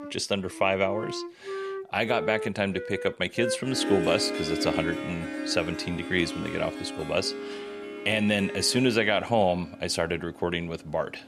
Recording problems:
background music; loud; throughout; 7 dB below the speech

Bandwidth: 13.5 kHz